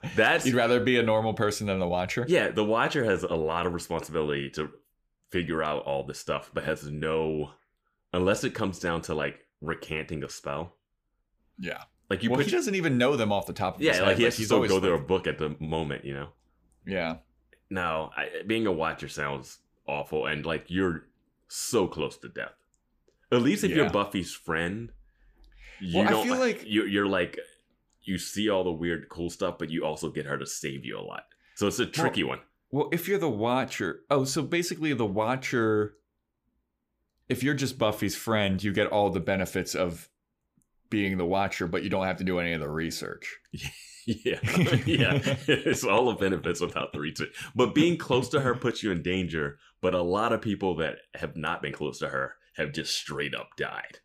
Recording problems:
none

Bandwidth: 15 kHz